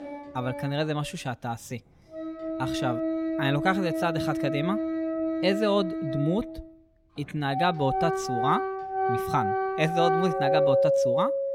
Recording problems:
background music; very loud; throughout; 1 dB above the speech

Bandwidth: 16.5 kHz